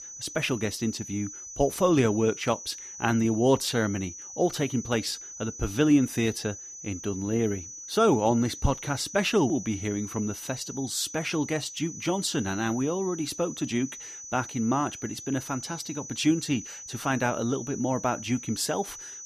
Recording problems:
high-pitched whine; noticeable; throughout; 6 kHz, 10 dB below the speech

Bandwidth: 14.5 kHz